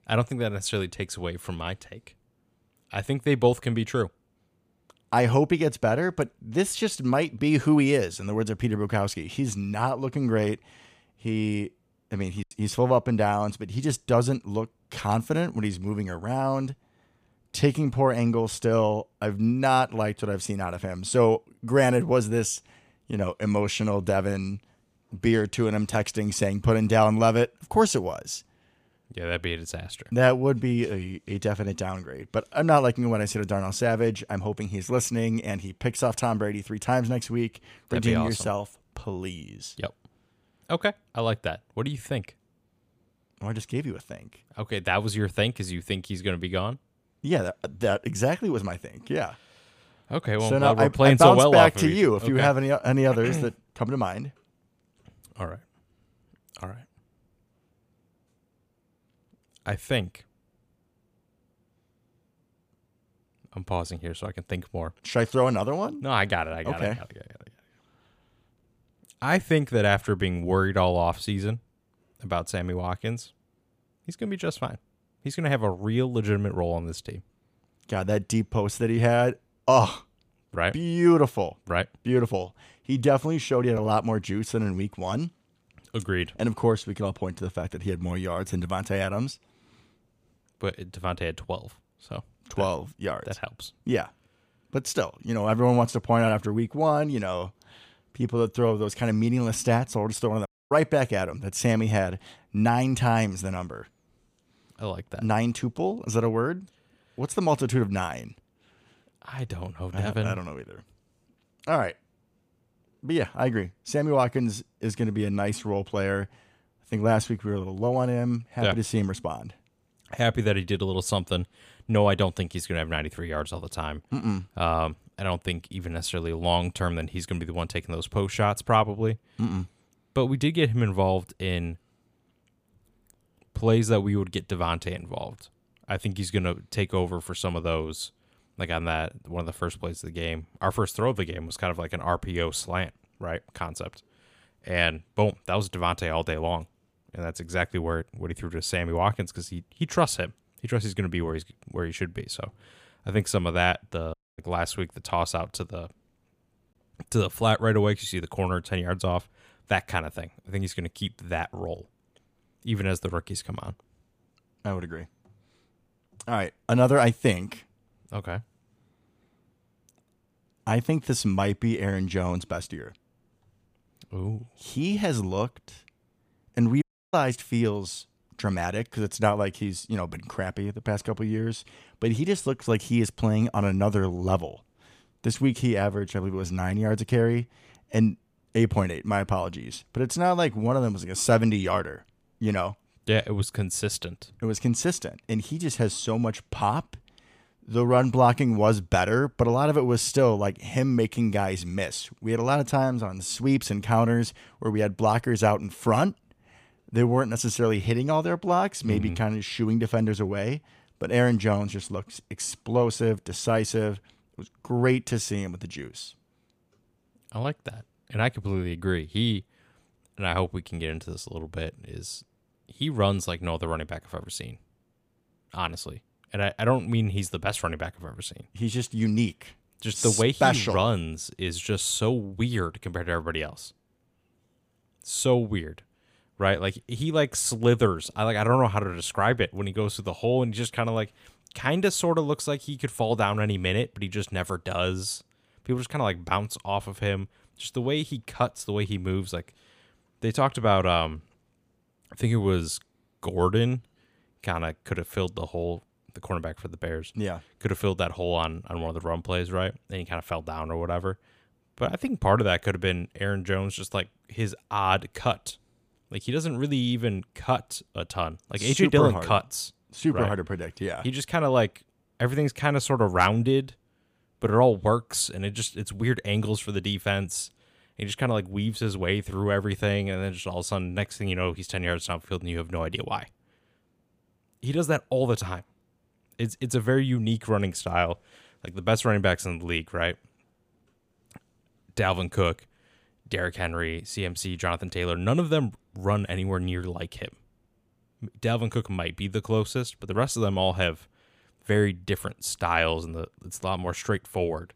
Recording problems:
choppy; occasionally; at 12 s; 1% of the speech affected
audio cutting out; at 1:40, at 2:34 and at 2:57

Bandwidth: 15 kHz